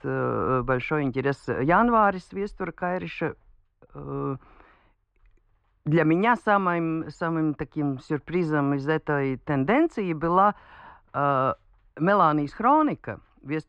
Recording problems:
muffled; very; fading above 2 kHz

